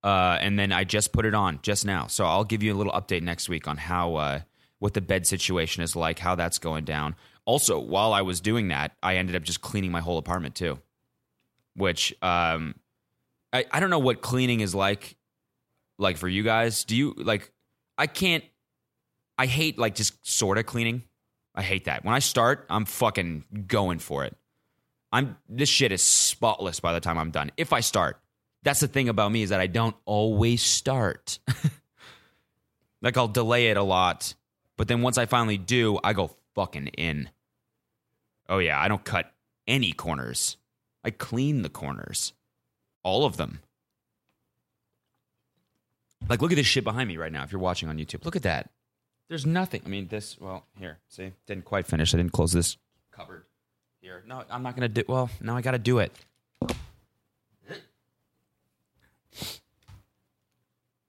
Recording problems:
none

